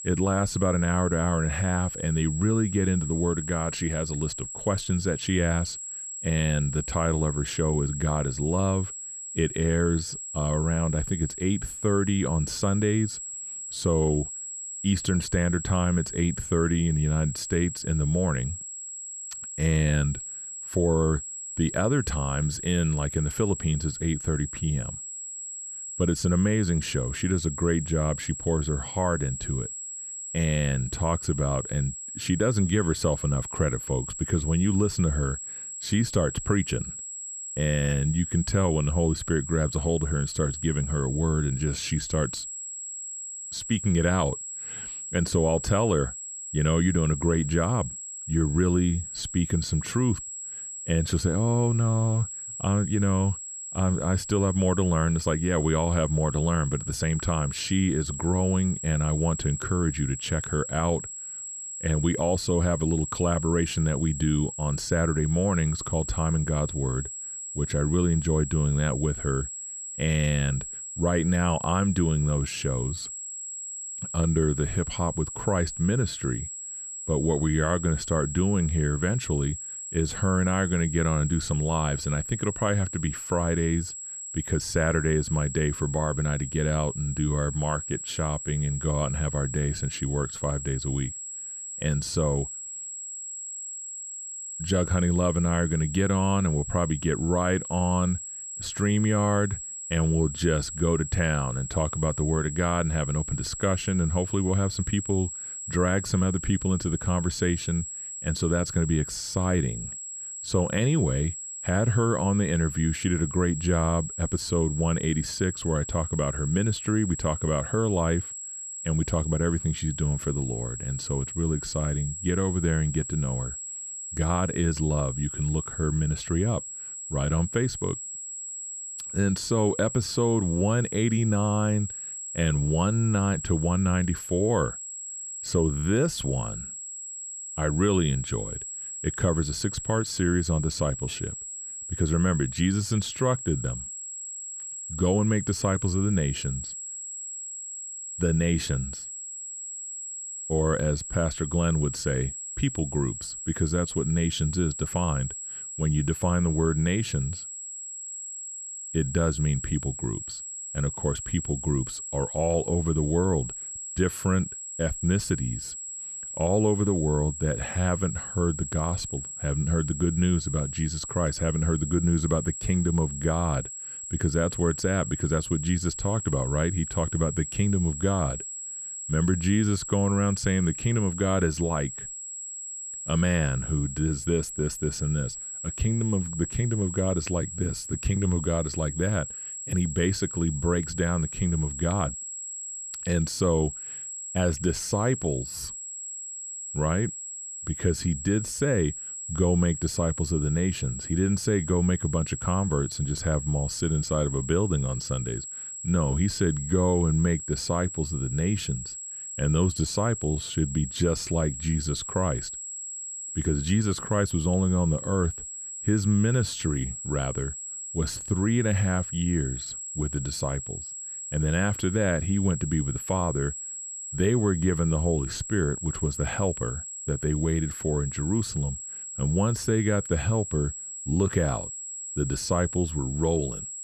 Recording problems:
high-pitched whine; loud; throughout; 7.5 kHz, 7 dB below the speech

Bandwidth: 14.5 kHz